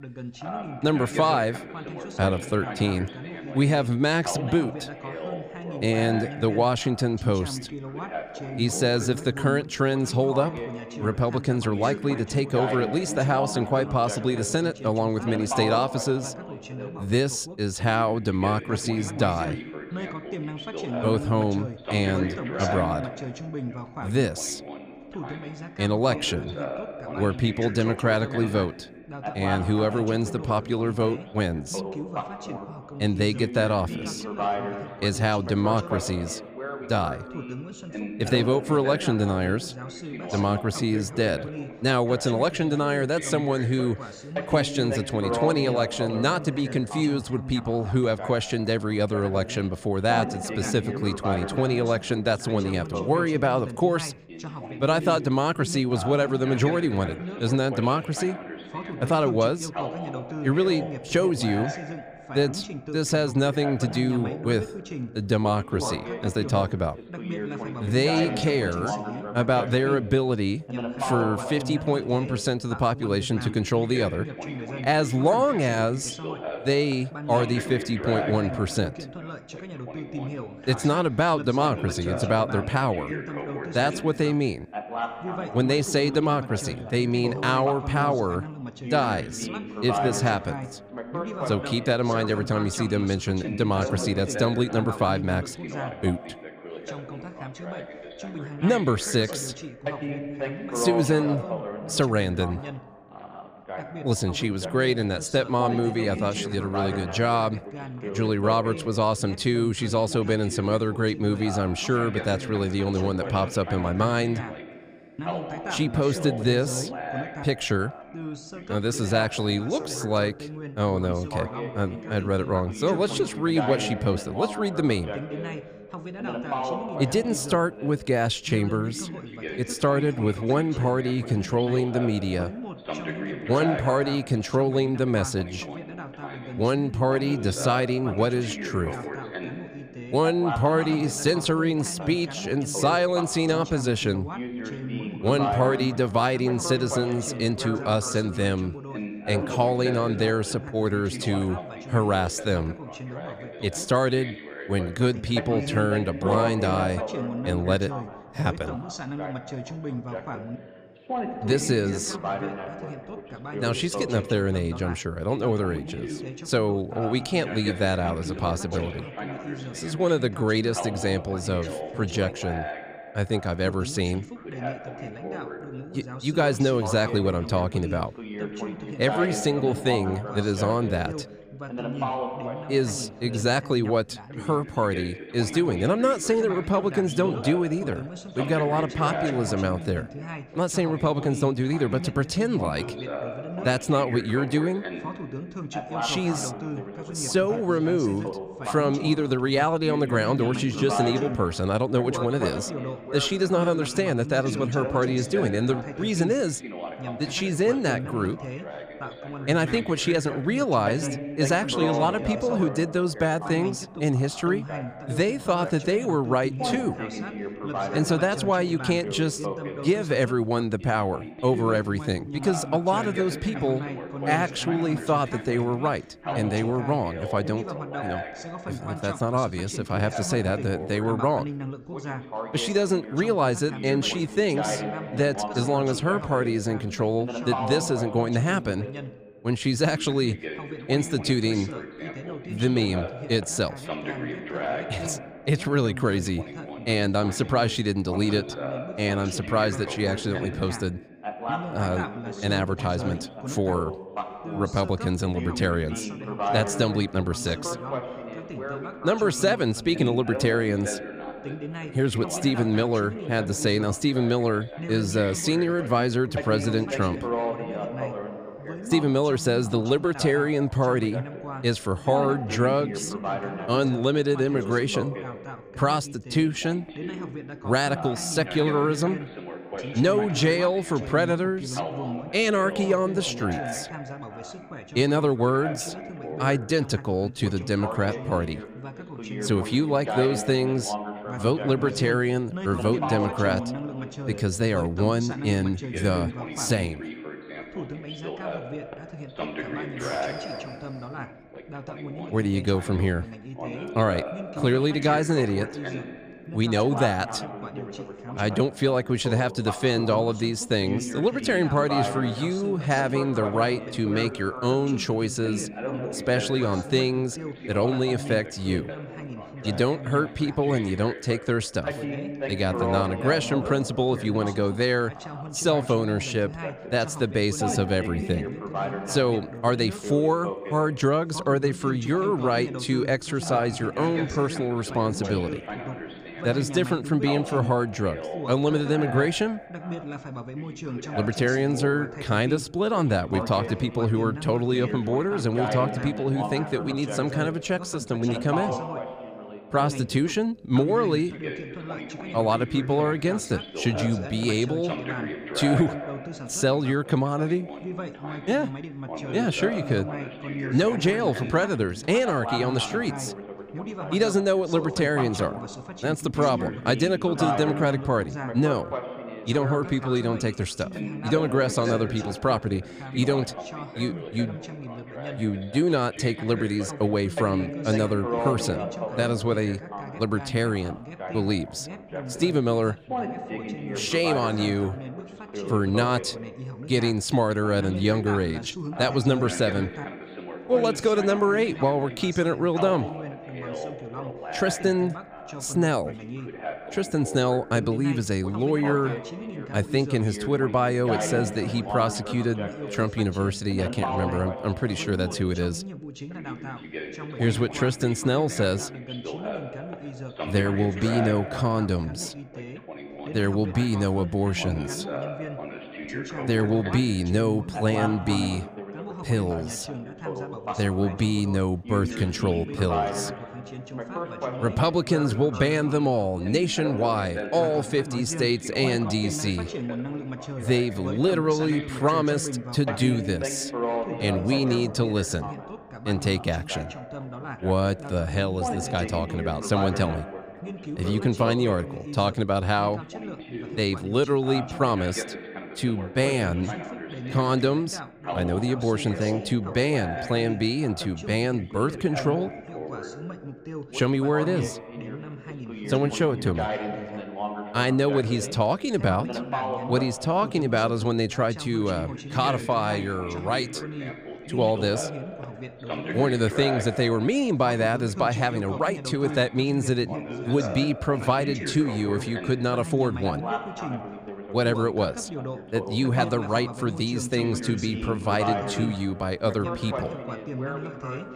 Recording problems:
background chatter; loud; throughout; 2 voices, 9 dB below the speech

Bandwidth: 15 kHz